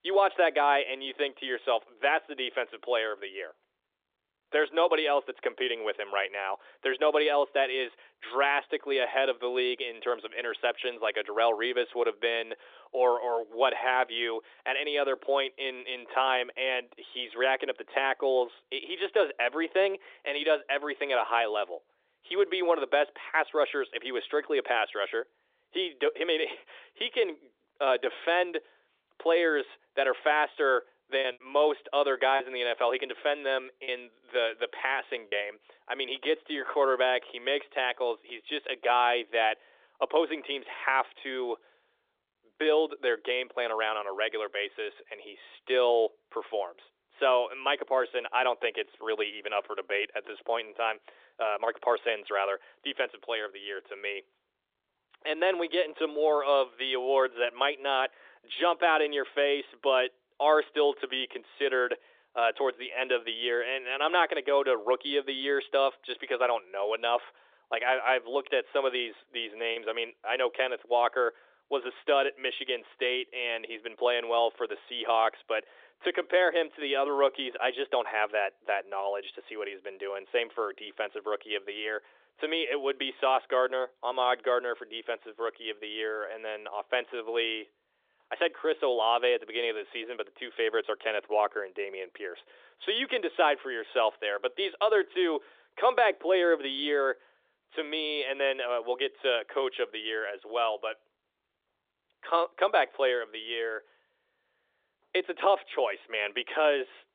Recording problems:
thin; very; fading below 350 Hz
phone-call audio; nothing above 3.5 kHz
muffled; very slightly; fading above 2.5 kHz
choppy; occasionally; from 31 to 35 s and at 1:10; 2% of the speech affected

